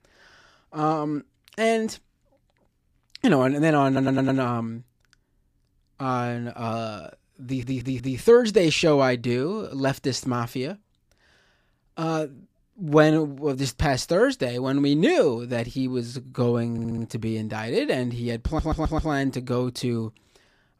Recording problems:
audio stuttering; 4 times, first at 4 s

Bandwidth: 15 kHz